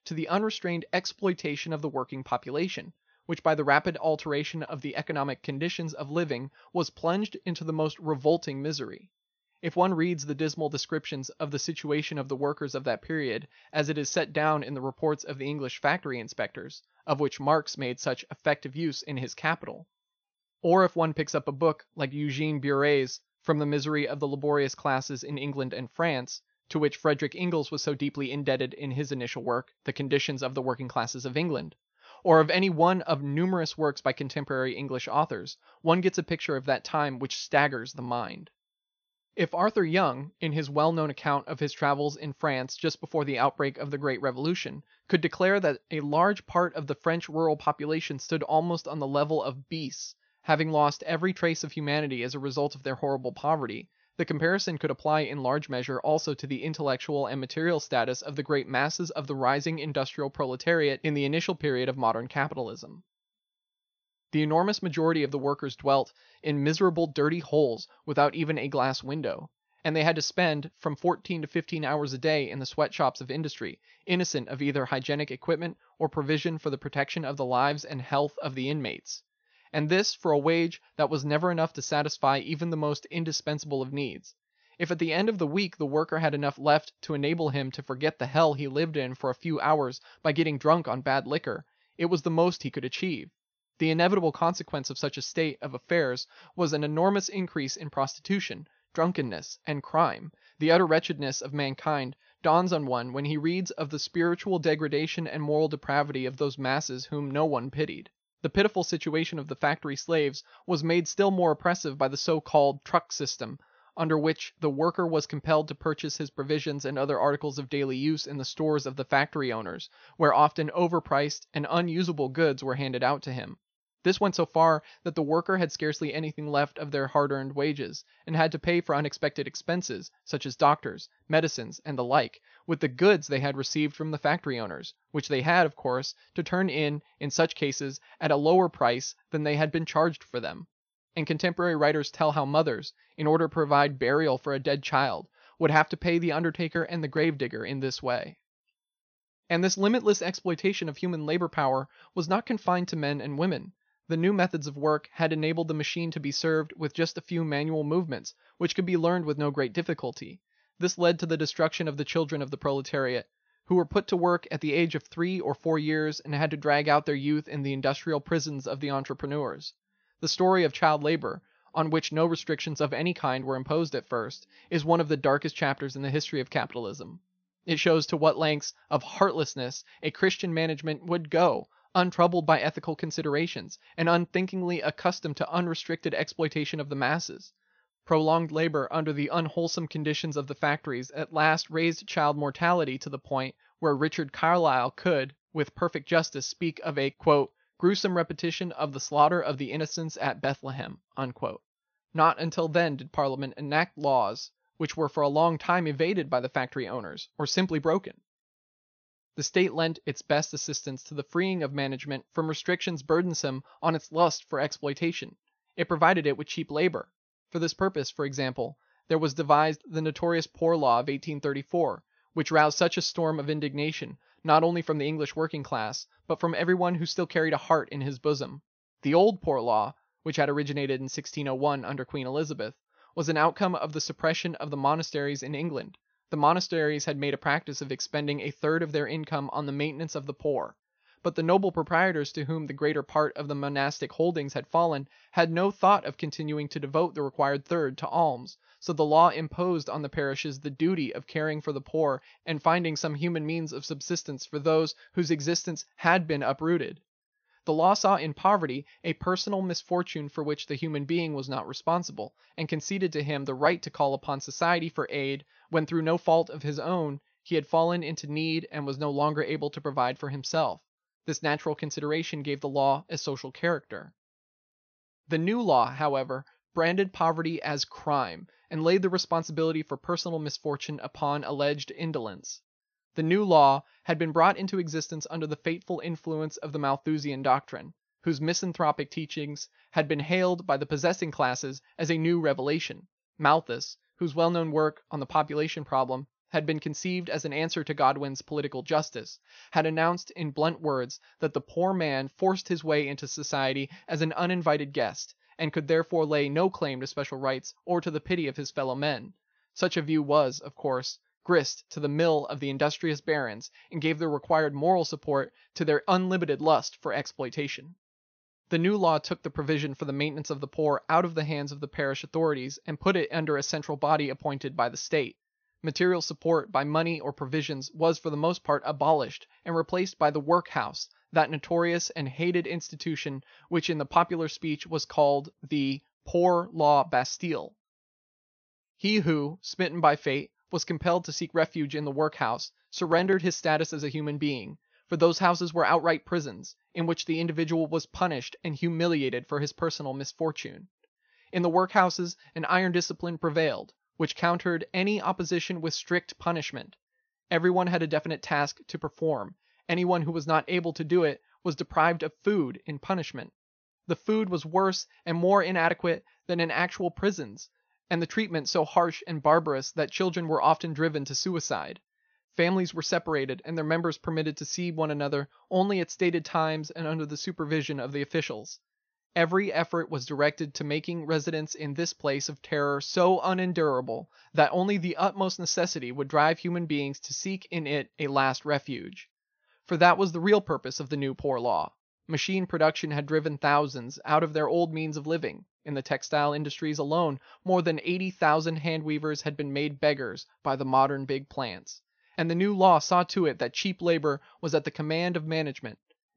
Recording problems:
high frequencies cut off; noticeable; nothing above 6.5 kHz

